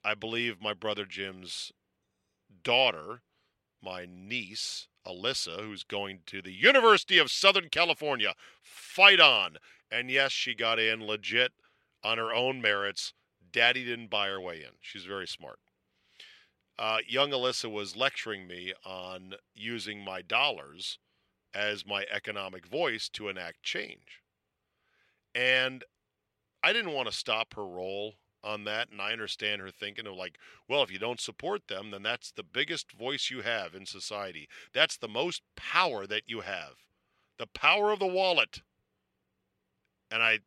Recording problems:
thin; very slightly; fading below 550 Hz

